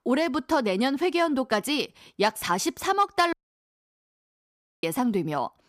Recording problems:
audio cutting out; at 3.5 s for 1.5 s

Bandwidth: 15 kHz